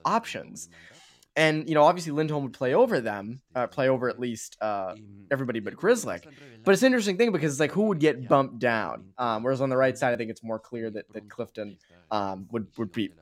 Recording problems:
voice in the background; faint; throughout; 30 dB below the speech

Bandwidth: 16 kHz